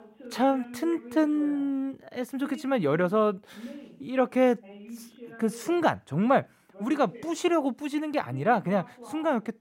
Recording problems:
voice in the background; noticeable; throughout; 20 dB below the speech

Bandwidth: 16 kHz